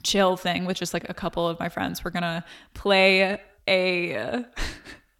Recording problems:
echo of what is said; faint; throughout; 100 ms later, 25 dB below the speech

